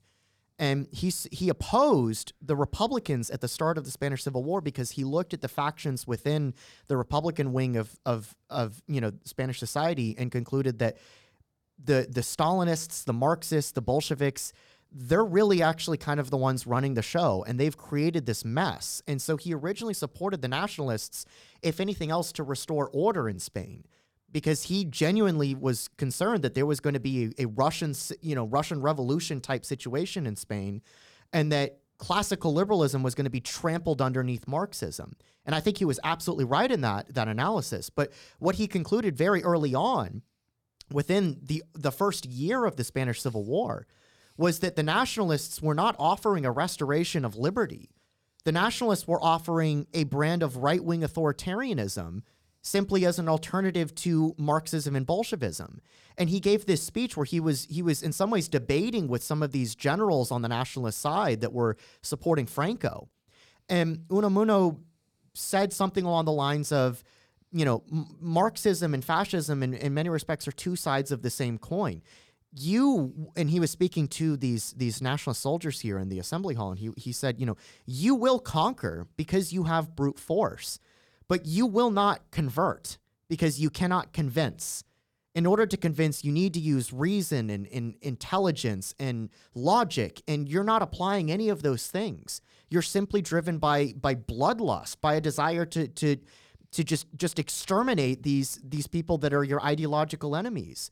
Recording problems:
none

